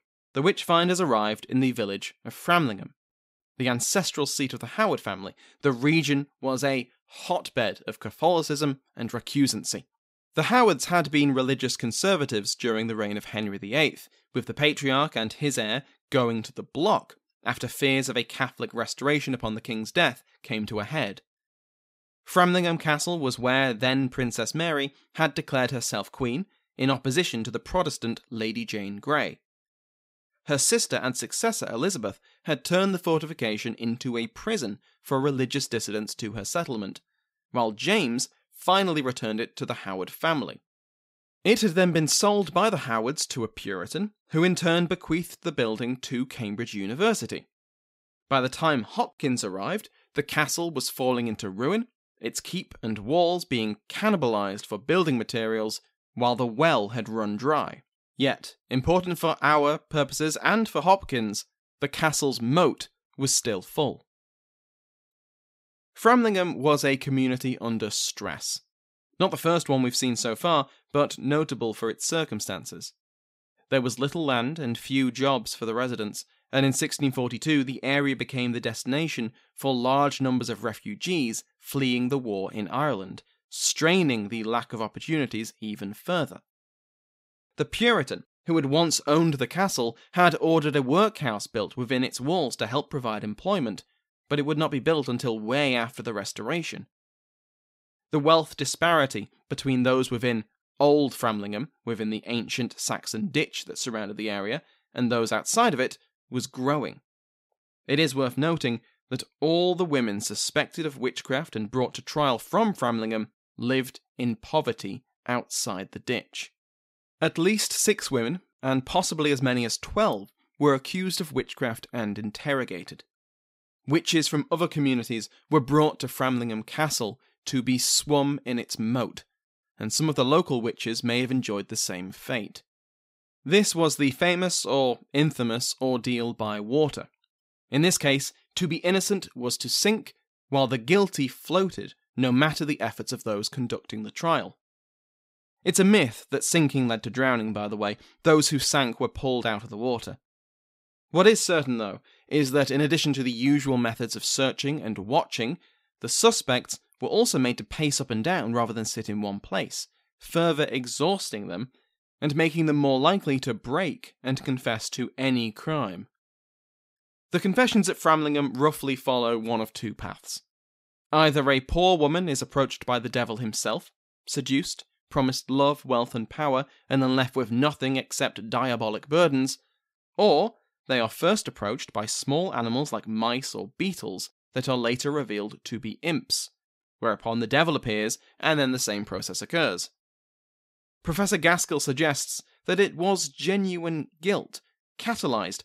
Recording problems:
none

